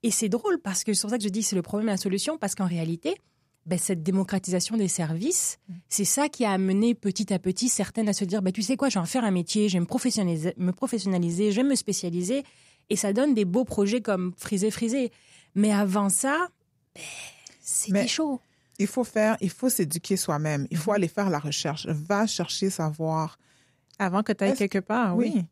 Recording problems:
none

